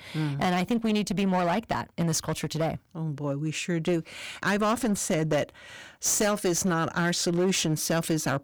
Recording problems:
distortion; slight; 11% of the sound clipped

